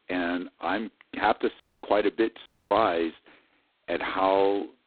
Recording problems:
phone-call audio; poor line; nothing above 4 kHz
audio cutting out; at 1.5 s and at 2.5 s

